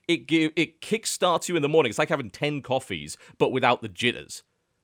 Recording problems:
none

